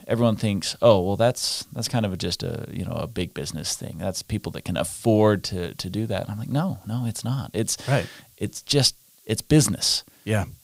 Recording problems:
hiss; faint; throughout; 30 dB below the speech

